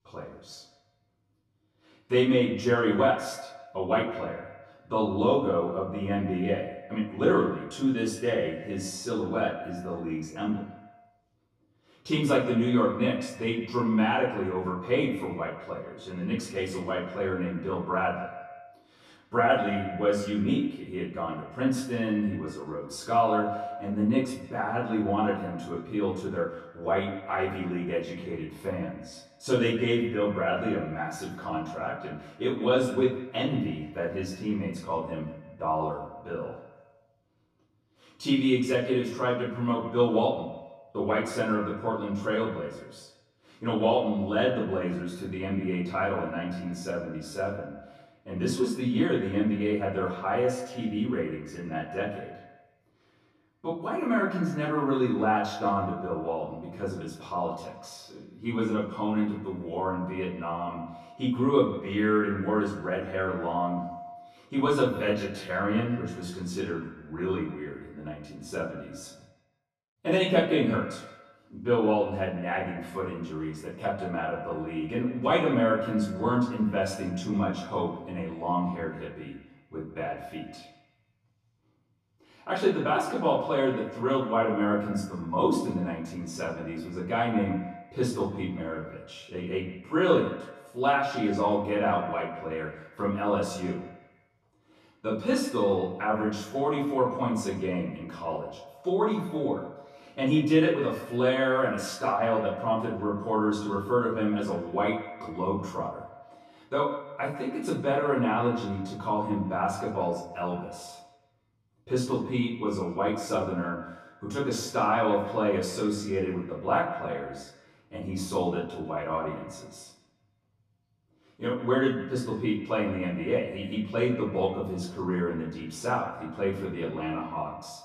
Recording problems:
off-mic speech; far
echo of what is said; noticeable; throughout; 150 ms later, 15 dB below the speech
room echo; noticeable; dies away in 0.4 s

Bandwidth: 14 kHz